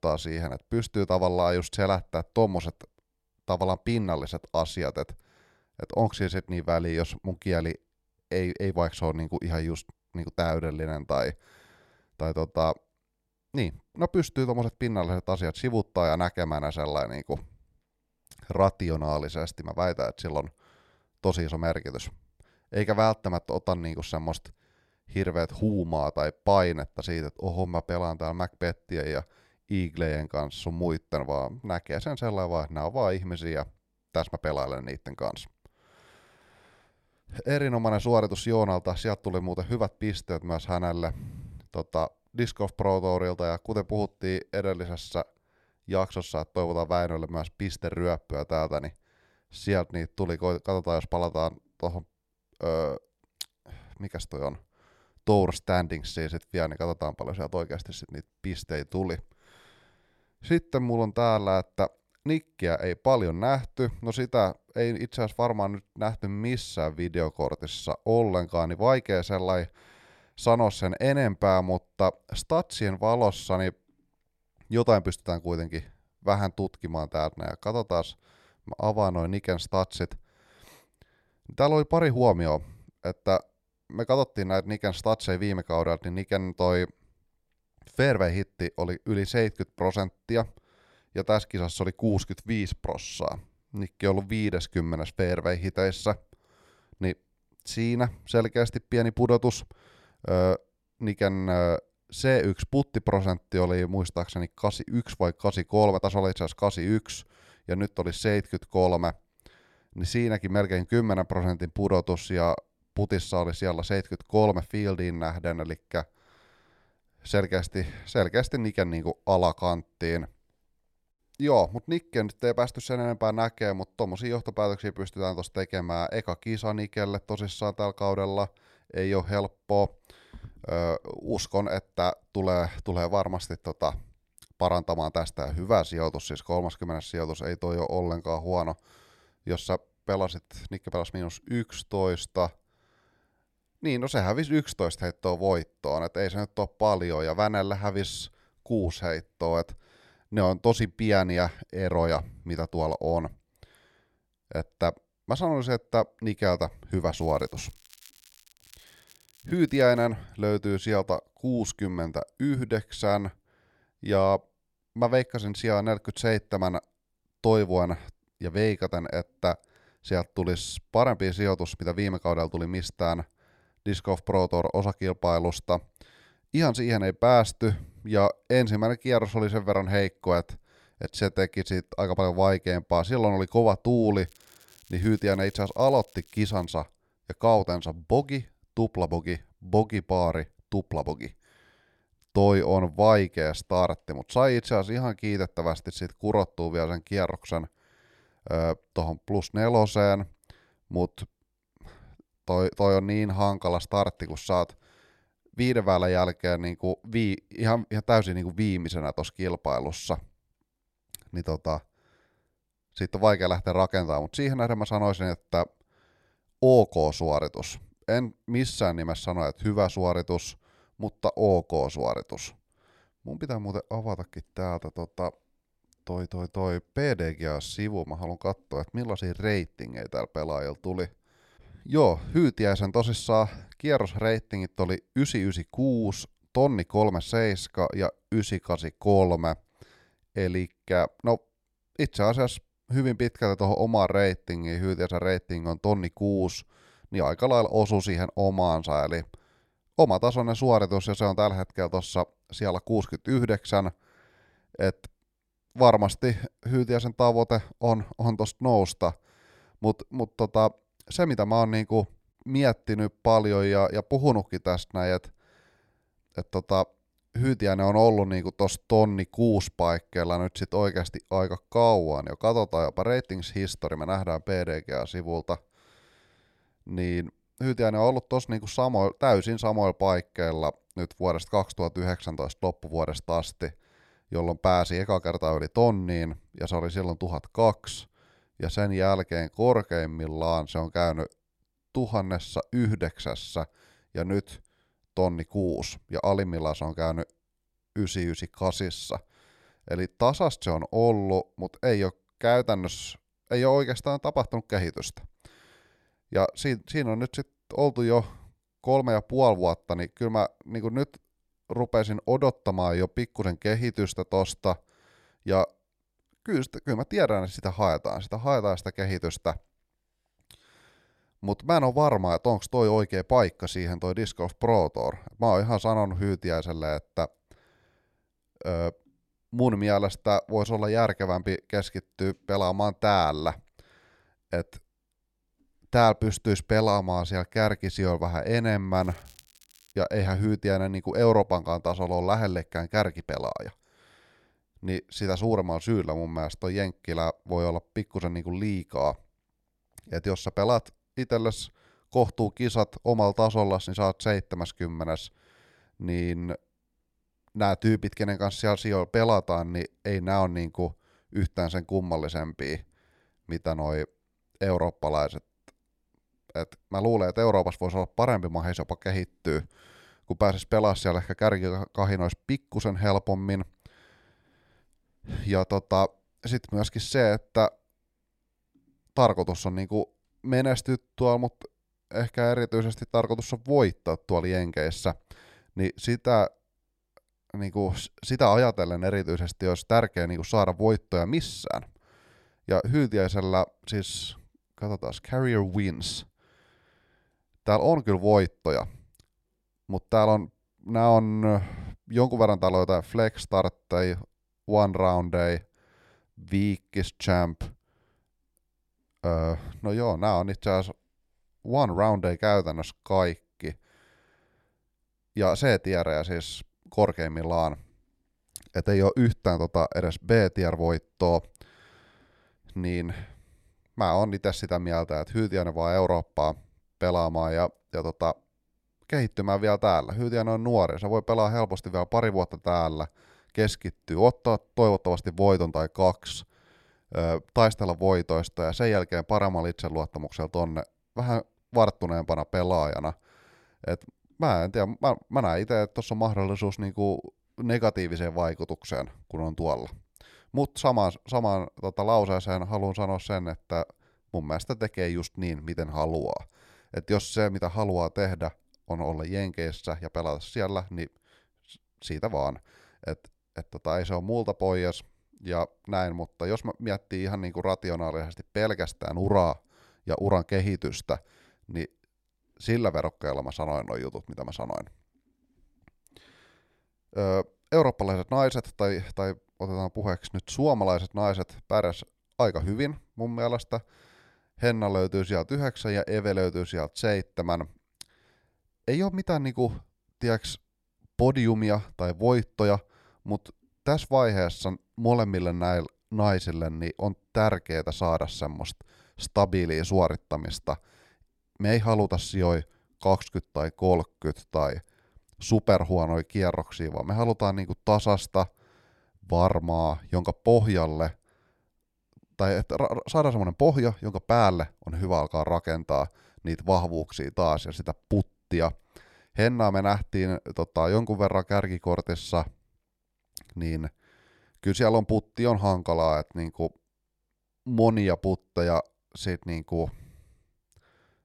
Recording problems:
crackling; faint; from 2:37 to 2:40, from 3:04 to 3:07 and at 5:39; 30 dB below the speech

